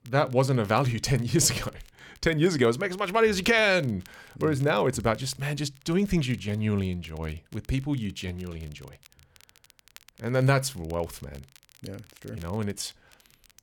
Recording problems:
crackle, like an old record; faint; 30 dB below the speech

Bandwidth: 17.5 kHz